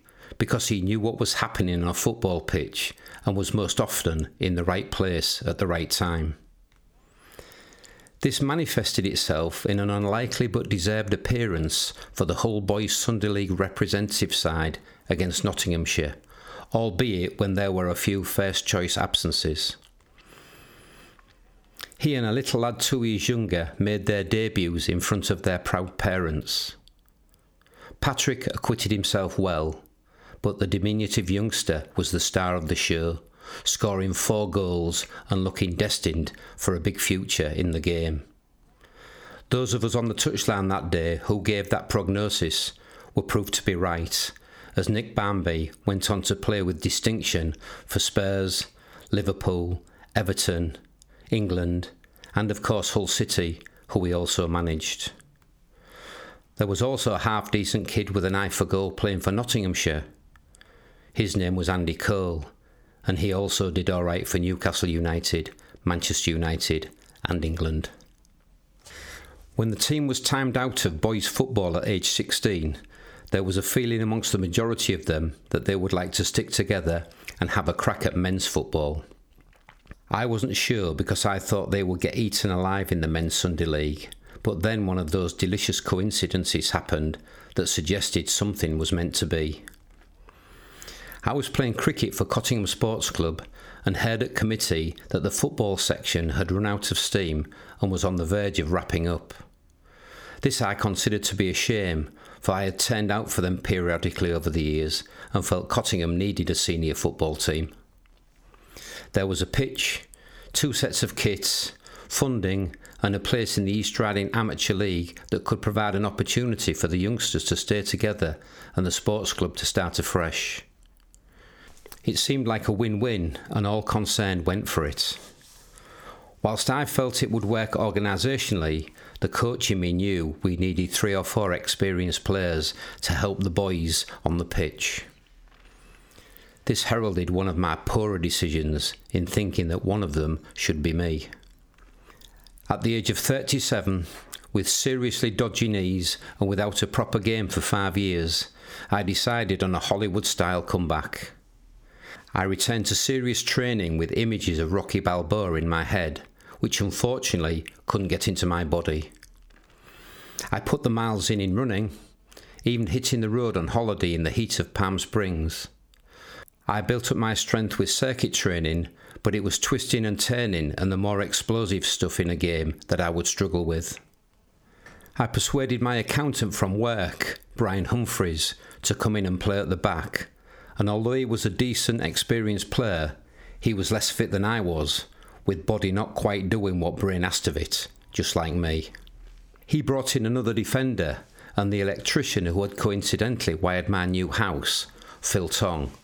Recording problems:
squashed, flat; somewhat

